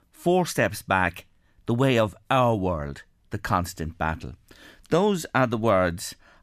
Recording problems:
none

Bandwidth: 14.5 kHz